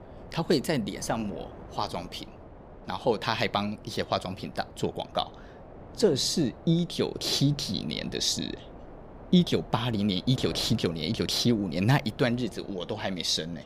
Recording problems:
wind noise on the microphone; occasional gusts; 20 dB below the speech

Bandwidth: 15 kHz